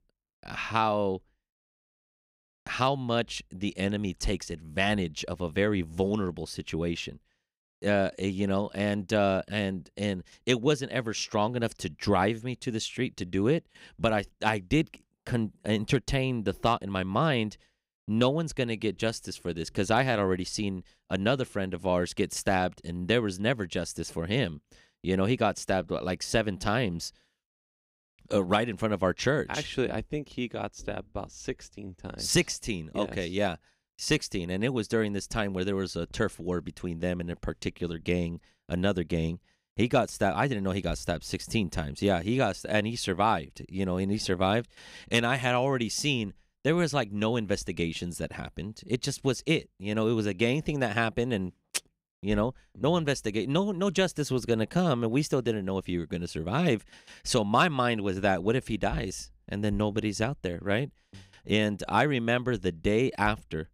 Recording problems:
none

